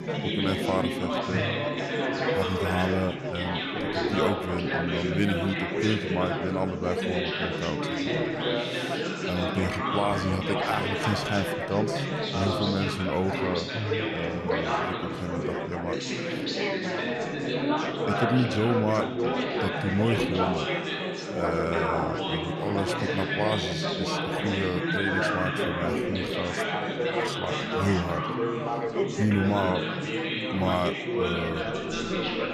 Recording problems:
chatter from many people; very loud; throughout; 2 dB above the speech

